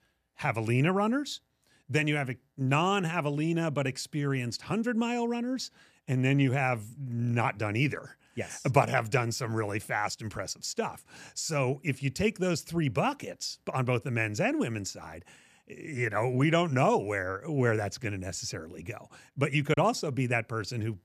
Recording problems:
choppy; occasionally; at 20 s; 3% of the speech affected

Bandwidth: 14.5 kHz